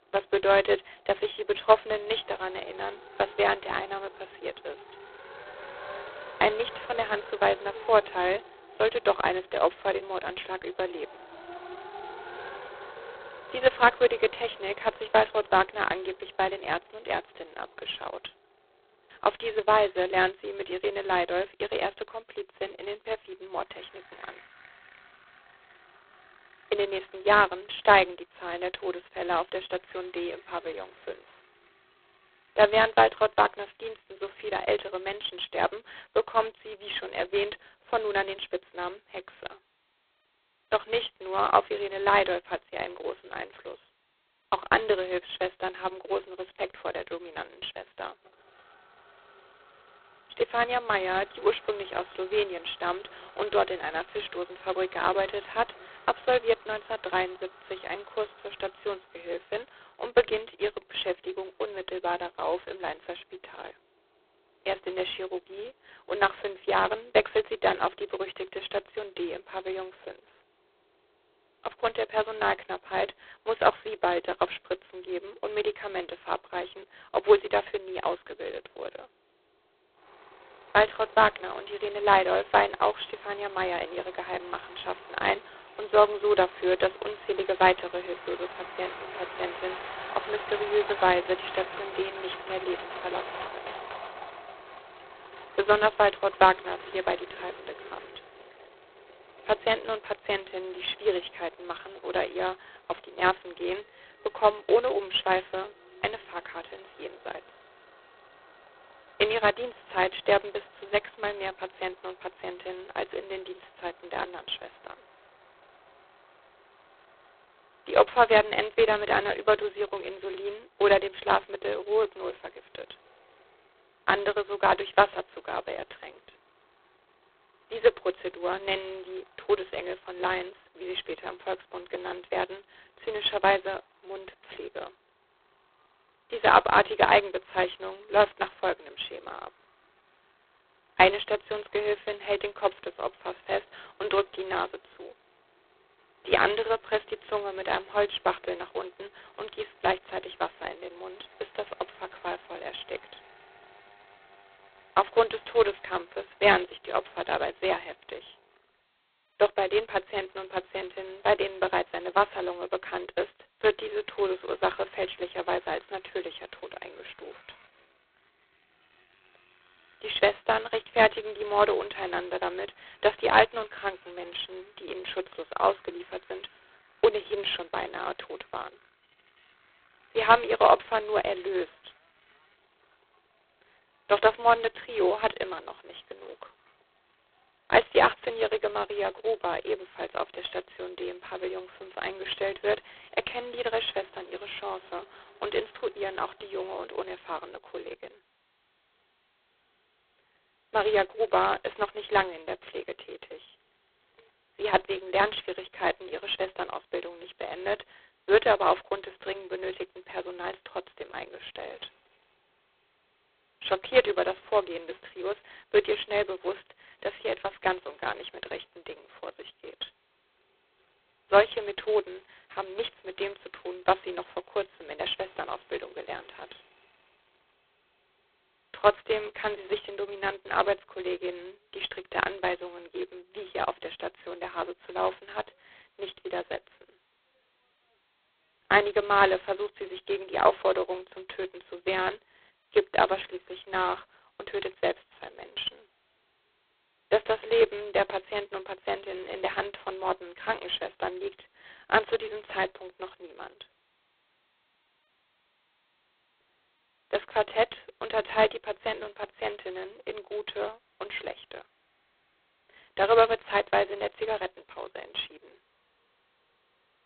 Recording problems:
phone-call audio; poor line; nothing above 4 kHz
traffic noise; noticeable; throughout; 20 dB below the speech

